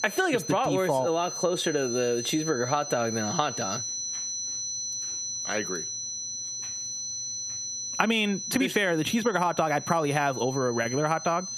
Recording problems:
squashed, flat; heavily
high-pitched whine; loud; throughout; 6 kHz, 6 dB below the speech

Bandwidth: 15 kHz